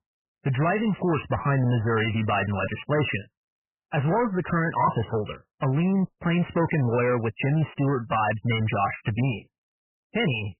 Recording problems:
garbled, watery; badly; nothing above 3 kHz
distortion; slight; 13% of the sound clipped

